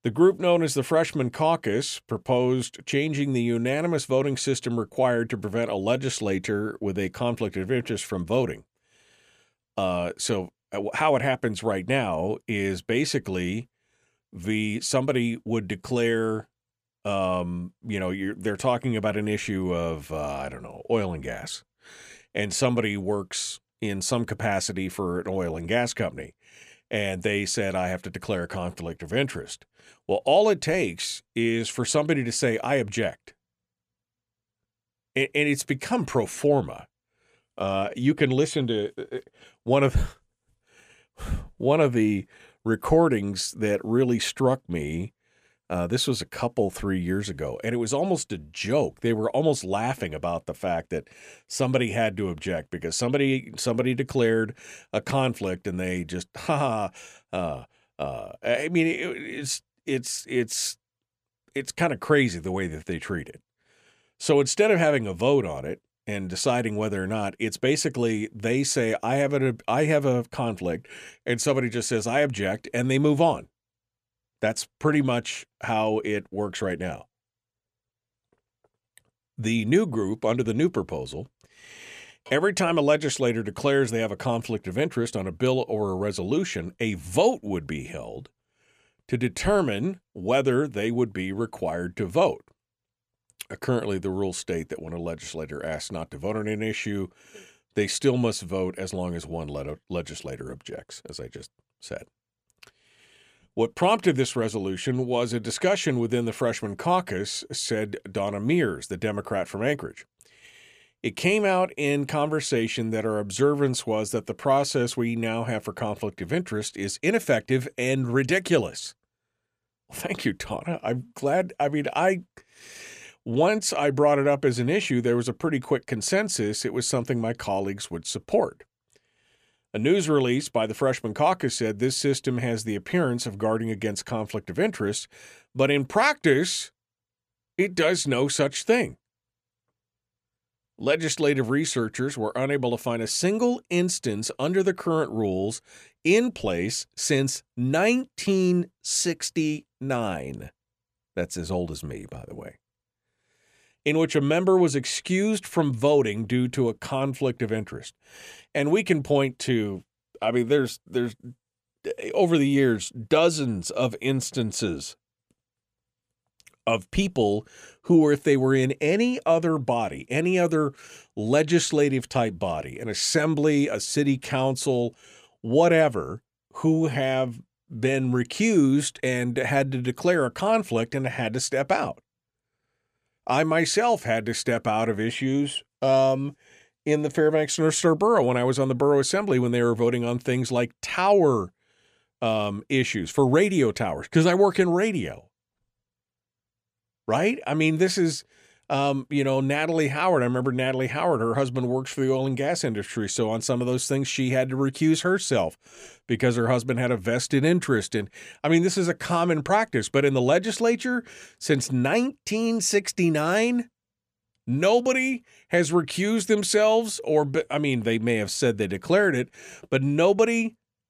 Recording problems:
none

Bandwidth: 14.5 kHz